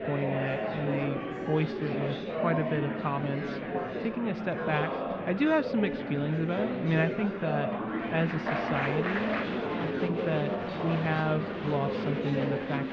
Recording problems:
muffled; slightly; fading above 3.5 kHz
murmuring crowd; loud; throughout; 1 dB below the speech

